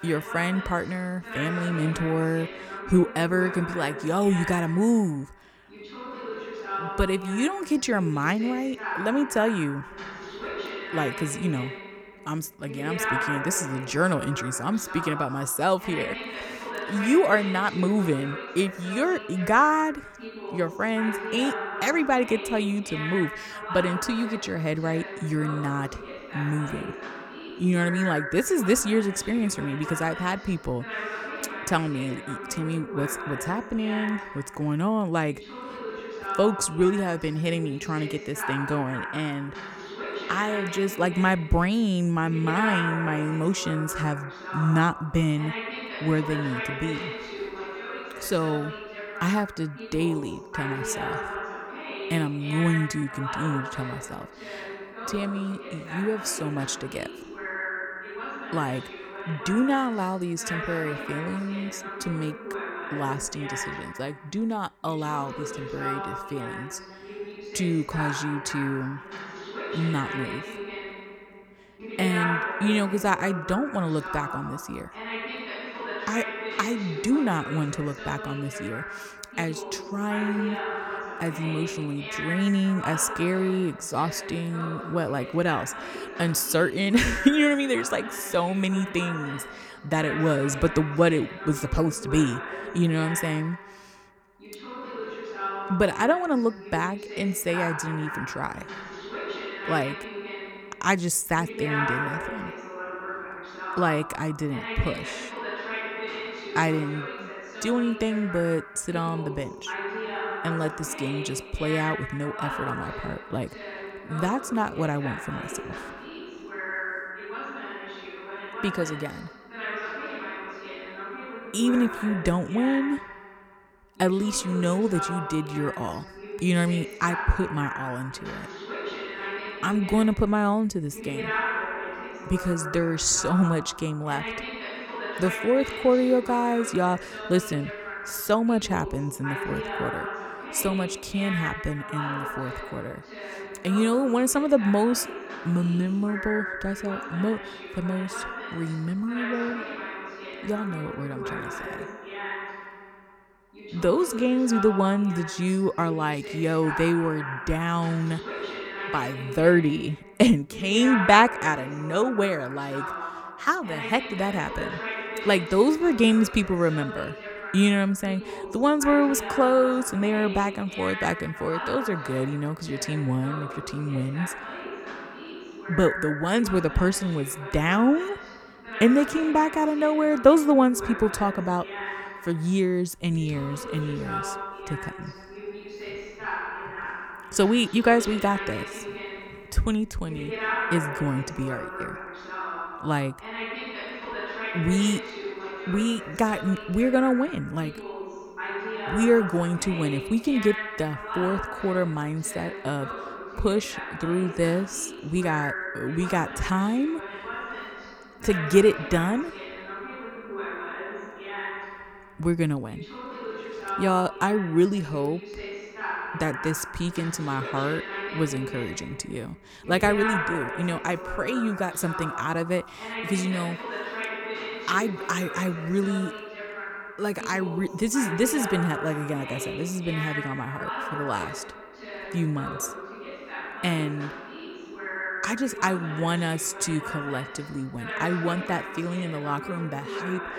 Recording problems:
voice in the background; loud; throughout; 8 dB below the speech

